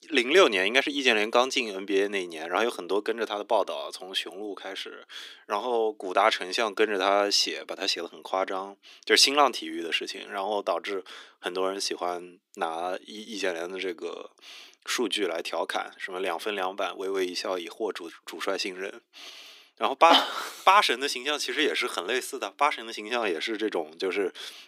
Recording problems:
thin; very; fading below 300 Hz

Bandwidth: 15.5 kHz